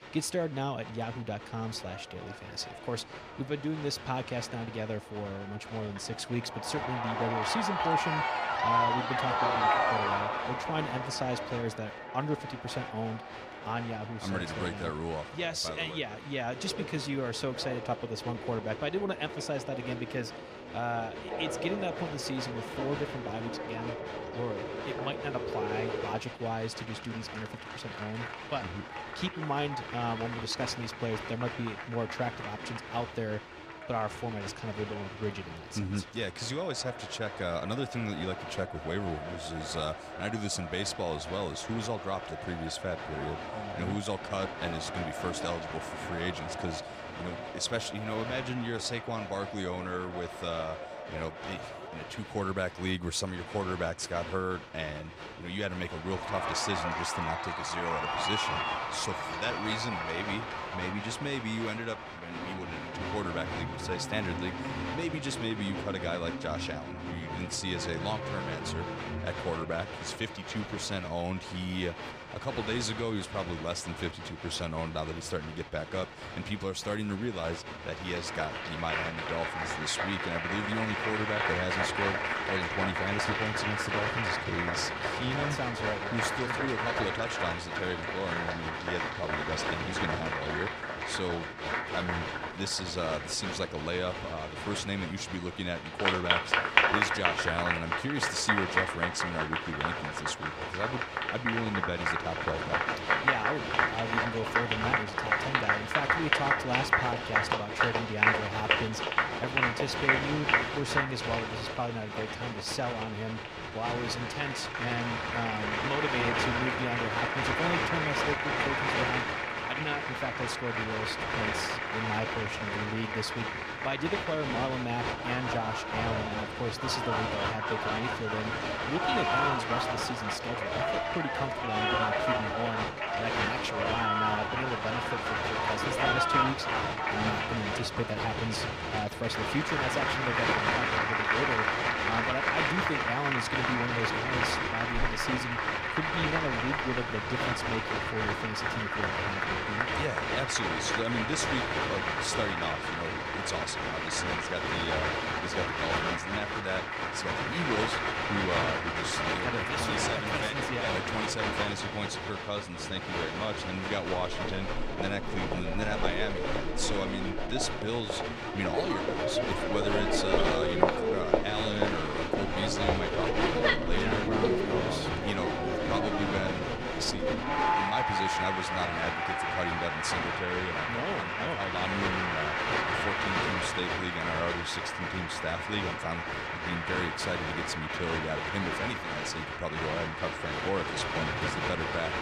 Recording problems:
crowd noise; very loud; throughout; 4 dB above the speech

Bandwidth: 14.5 kHz